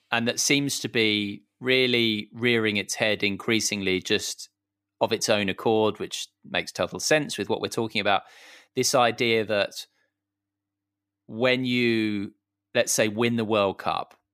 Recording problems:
none

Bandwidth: 15 kHz